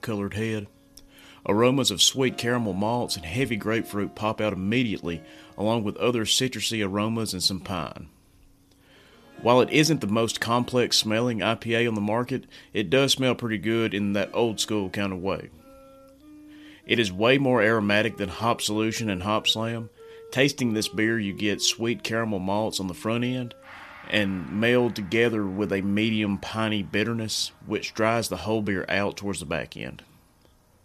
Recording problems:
background music; faint; throughout; 25 dB below the speech

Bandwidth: 14.5 kHz